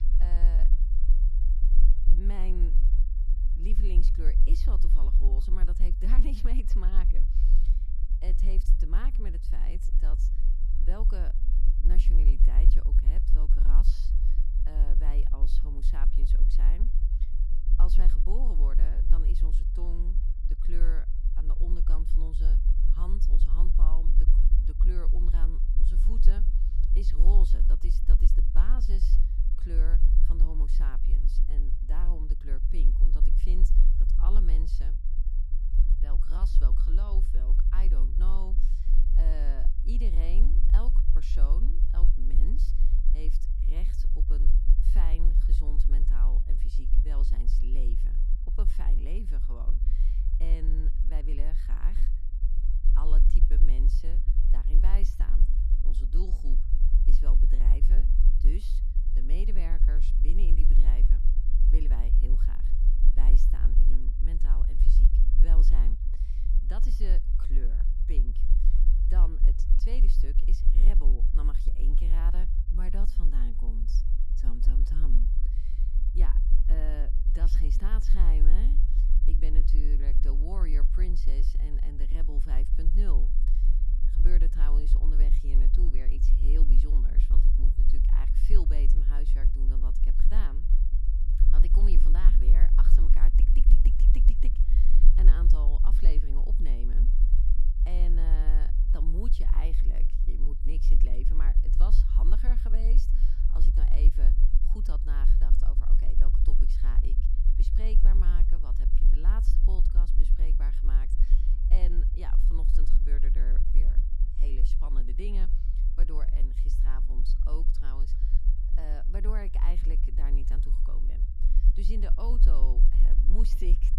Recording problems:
low rumble; loud; throughout; 4 dB below the speech

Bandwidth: 14.5 kHz